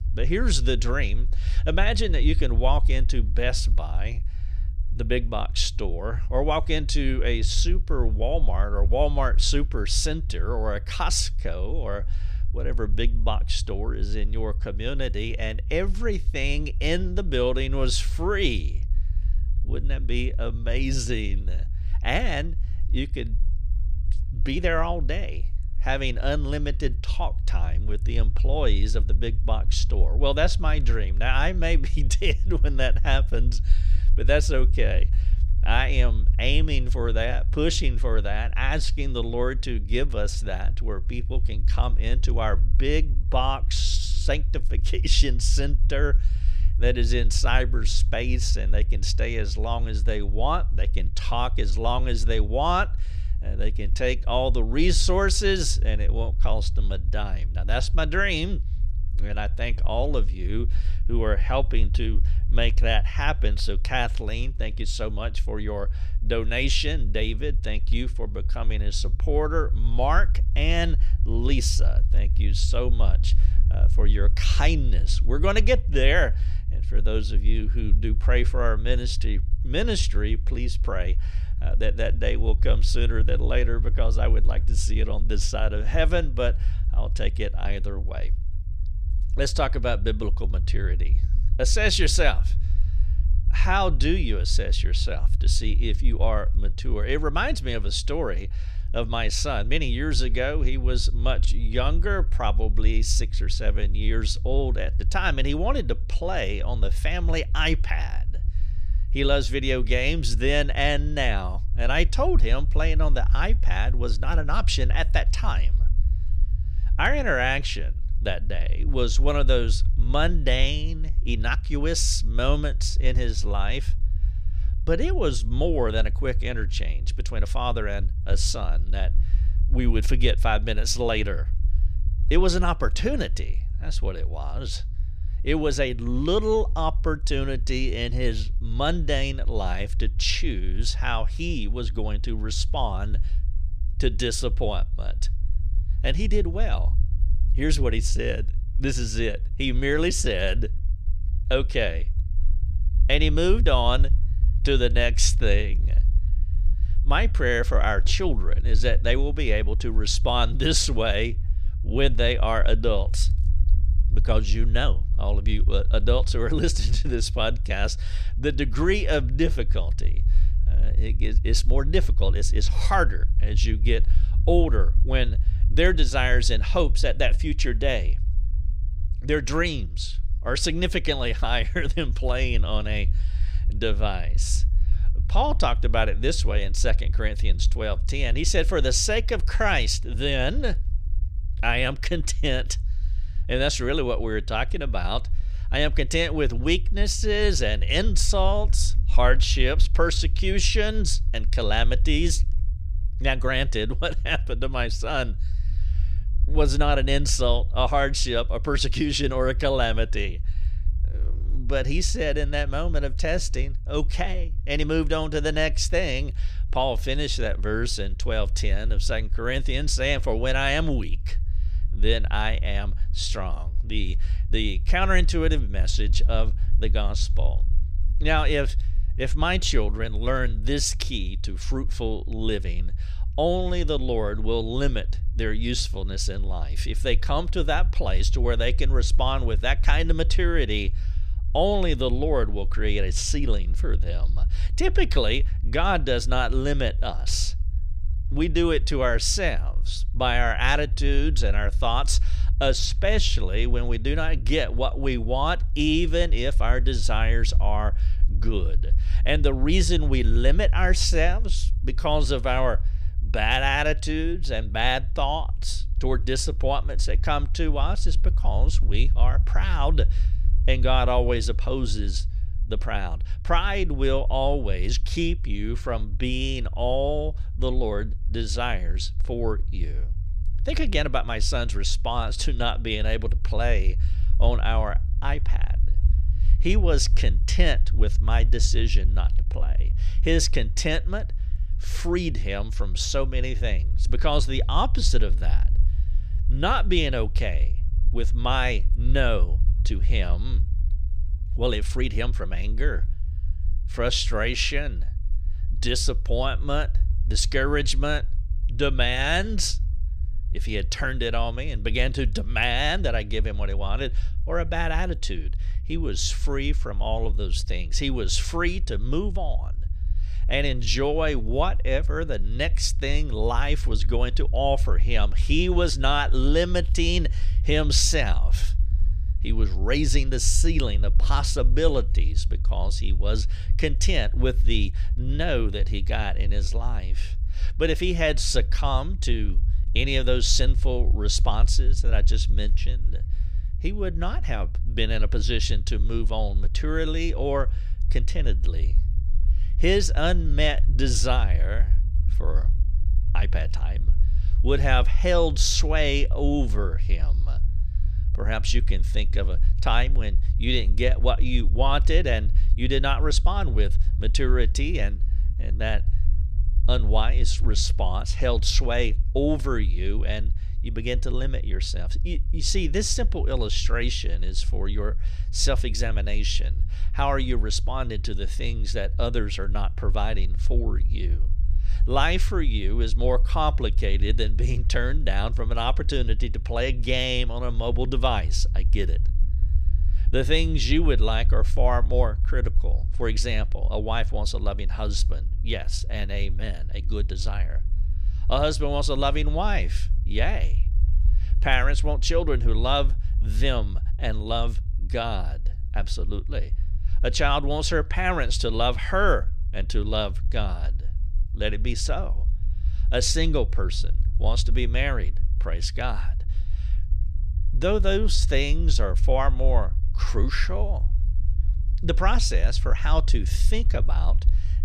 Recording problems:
low rumble; faint; throughout; 20 dB below the speech

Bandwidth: 15 kHz